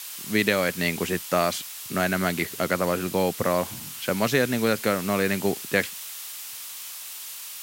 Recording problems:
hiss; loud; throughout; 9 dB below the speech

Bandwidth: 16 kHz